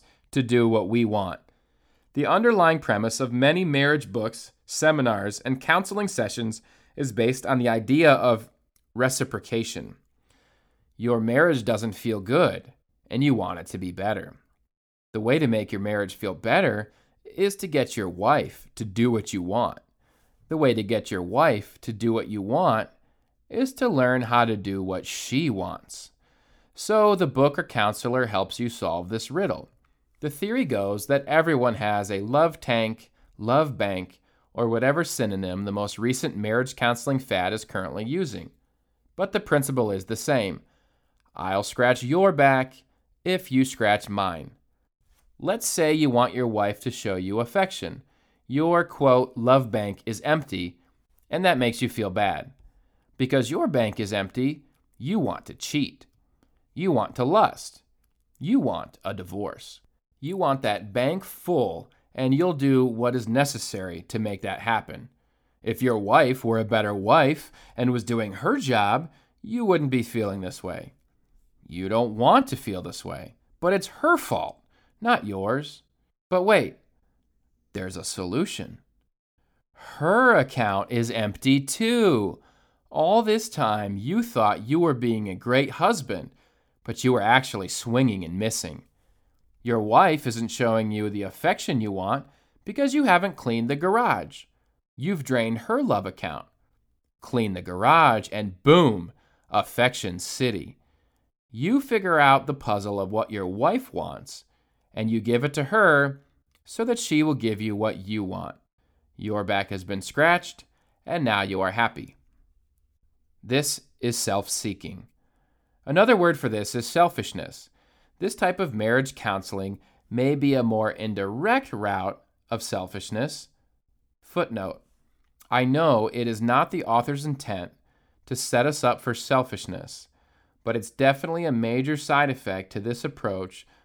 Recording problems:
none

